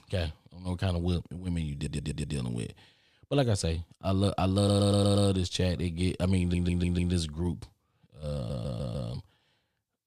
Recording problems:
audio stuttering; 4 times, first at 2 s

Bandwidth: 14.5 kHz